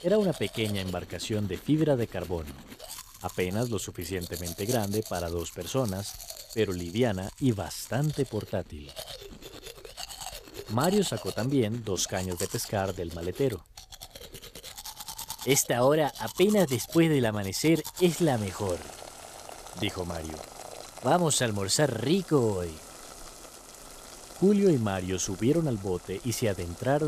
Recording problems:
household noises; noticeable; throughout; 15 dB below the speech
abrupt cut into speech; at the end

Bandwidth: 14.5 kHz